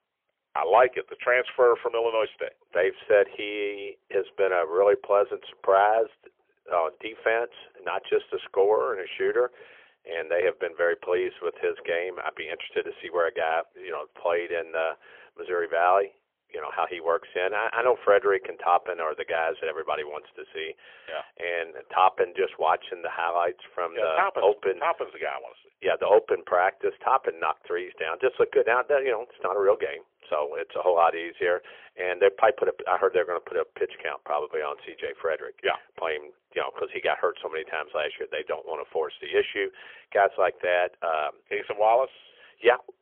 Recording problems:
phone-call audio; poor line; nothing above 3.5 kHz

